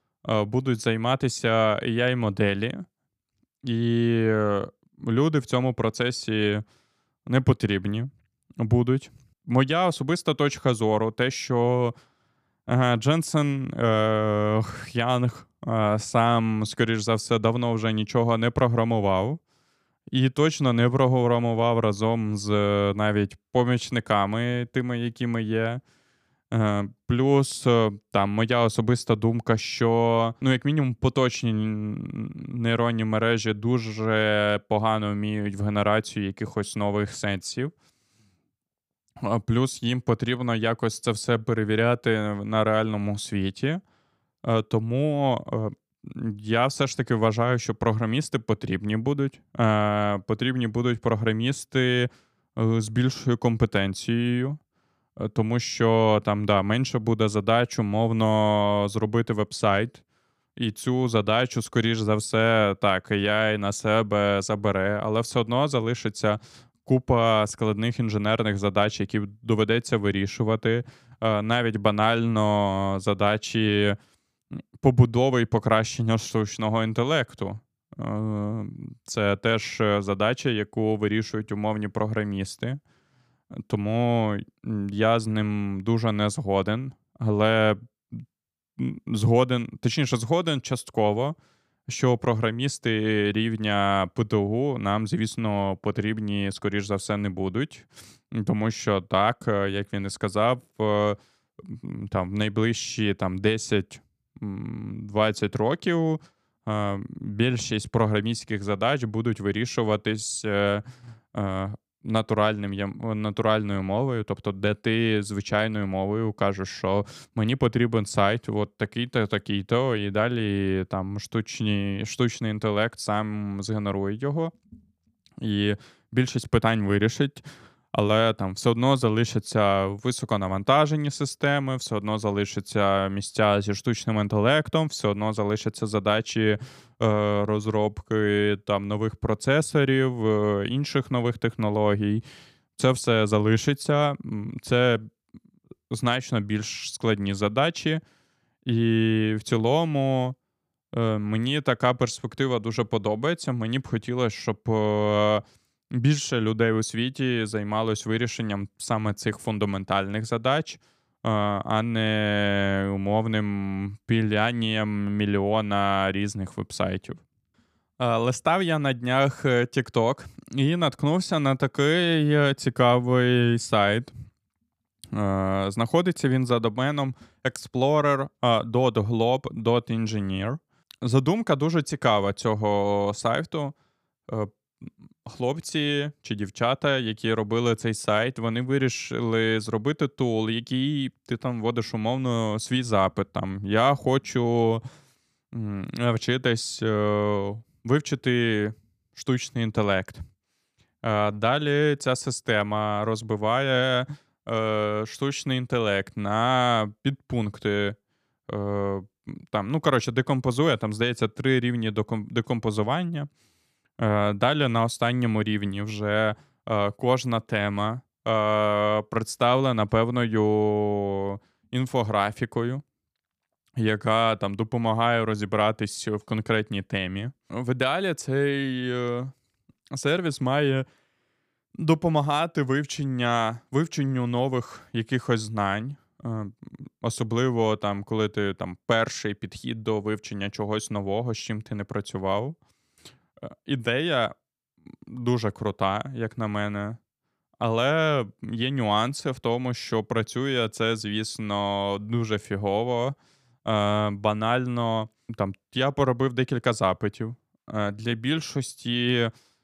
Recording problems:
none

